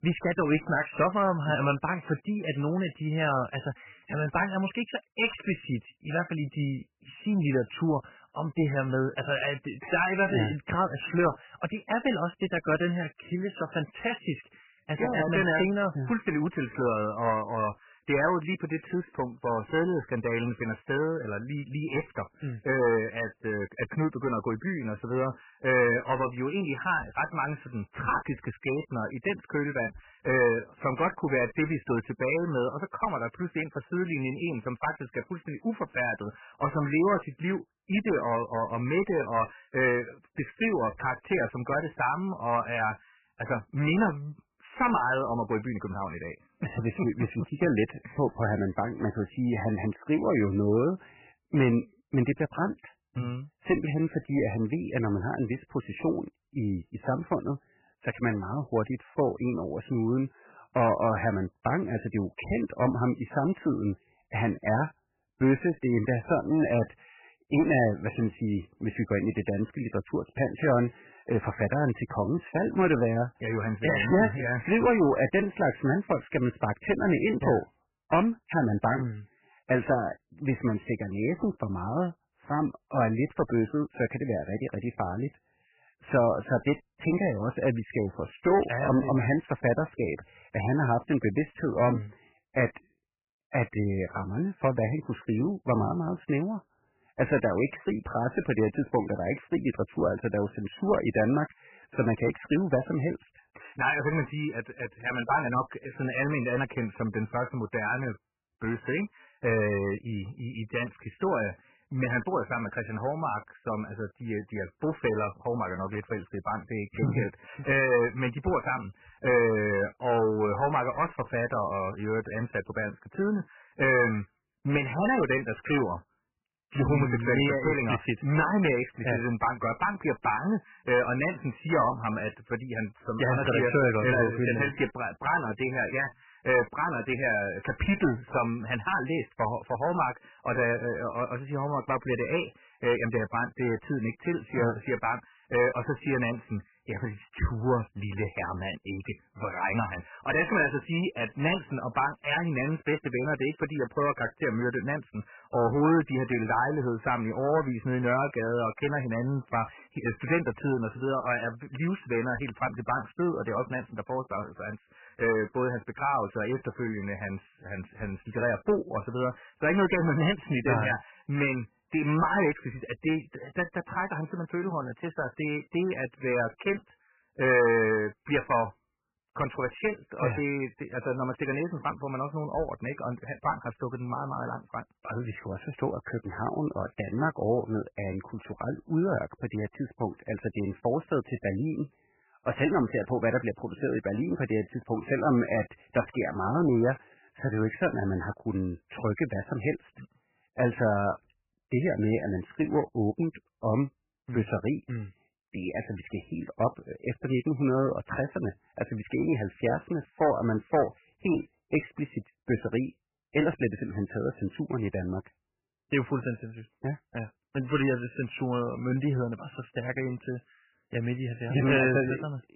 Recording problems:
garbled, watery; badly; nothing above 3 kHz
distortion; slight; 4% of the sound clipped

